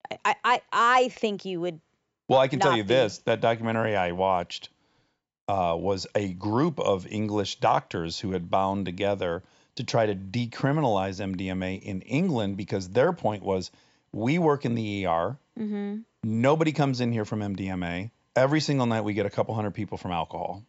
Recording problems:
high frequencies cut off; noticeable; nothing above 8 kHz

